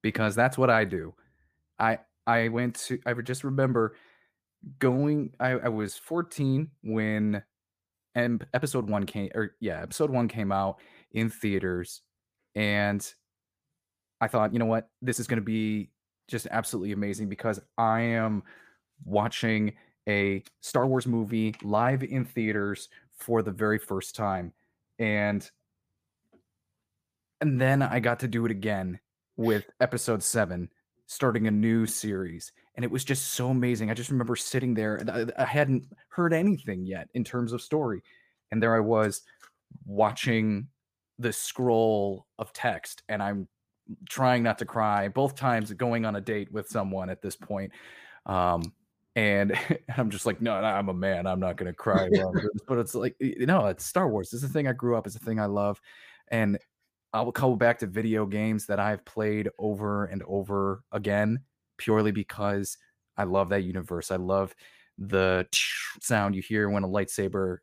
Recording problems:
uneven, jittery; strongly; from 2 s to 1:06

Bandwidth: 15 kHz